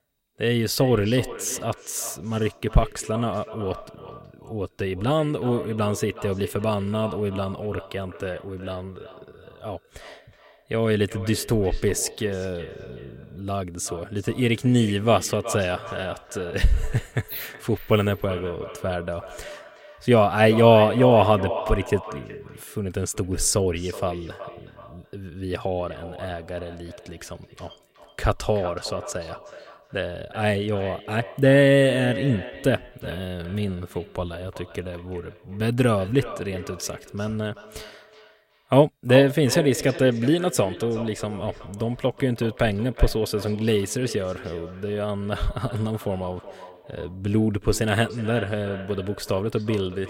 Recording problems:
echo of what is said; noticeable; throughout; 370 ms later, 15 dB below the speech

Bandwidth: 16 kHz